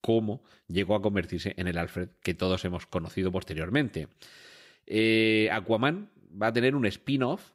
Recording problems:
none

